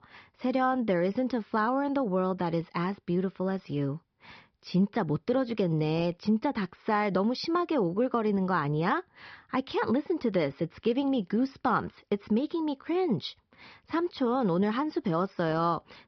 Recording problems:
high frequencies cut off; noticeable; nothing above 5.5 kHz

